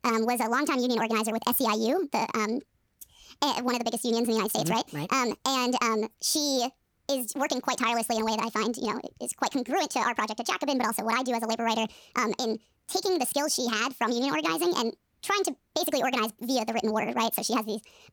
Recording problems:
wrong speed and pitch; too fast and too high; 1.5 times normal speed

